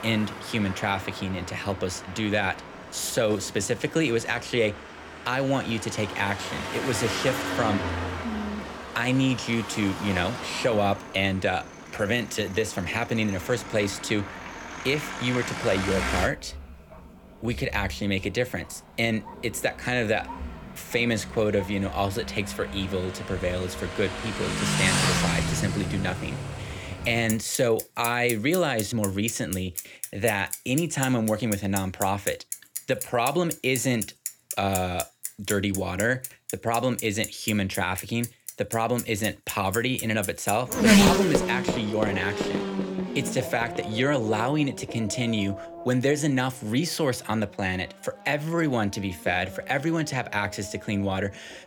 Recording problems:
traffic noise; loud; throughout; 5 dB below the speech

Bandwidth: 18.5 kHz